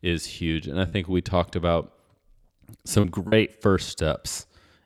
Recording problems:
choppy; occasionally; 4% of the speech affected

